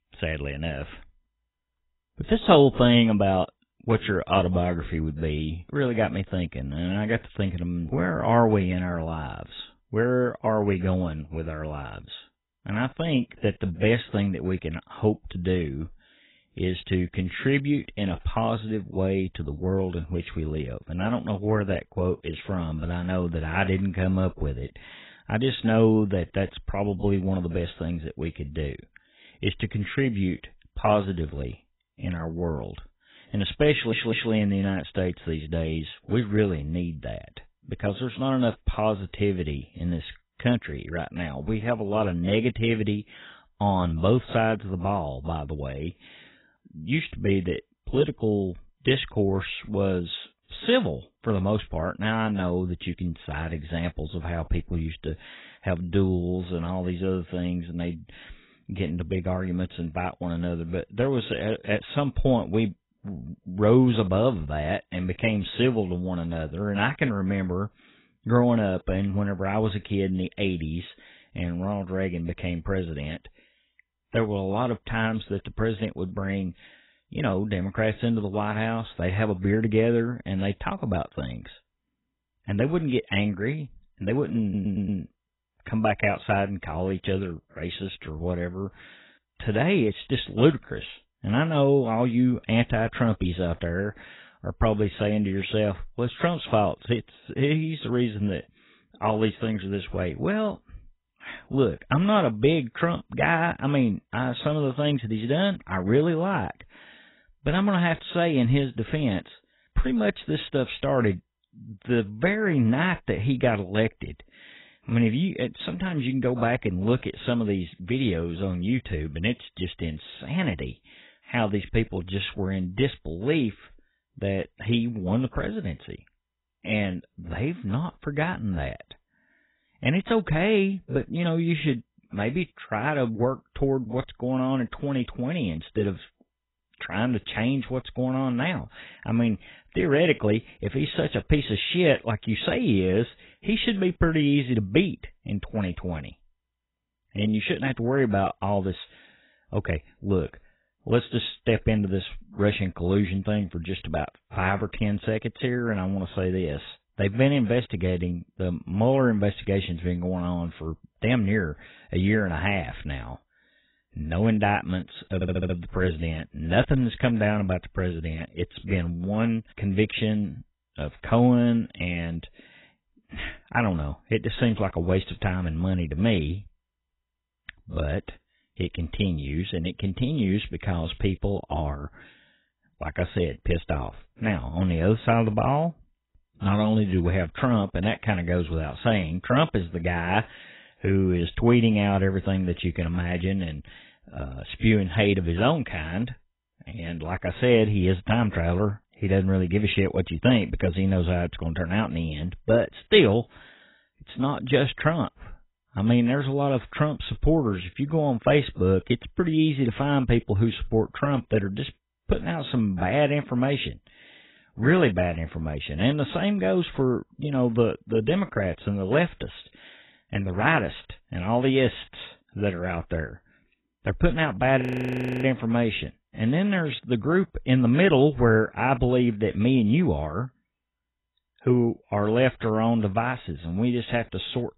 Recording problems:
garbled, watery; badly; nothing above 4 kHz
audio stuttering; at 34 s, at 1:24 and at 2:45
audio freezing; at 3:45 for 0.5 s

